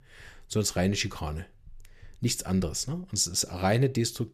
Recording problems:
none

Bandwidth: 14.5 kHz